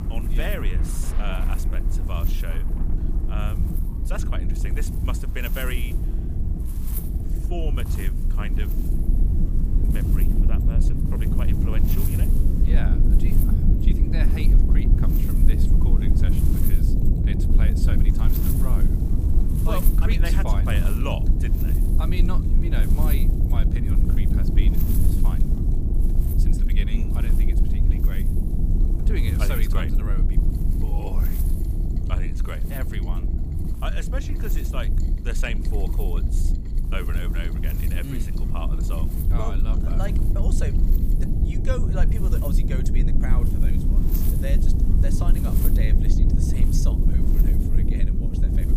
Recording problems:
low rumble; loud; throughout; 1 dB below the speech
rain or running water; noticeable; throughout; 20 dB below the speech
wind noise on the microphone; occasional gusts; 10 dB below the speech

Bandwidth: 15 kHz